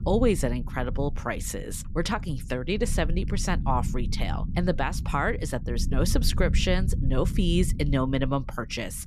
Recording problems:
low rumble; noticeable; throughout; 15 dB below the speech

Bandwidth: 14 kHz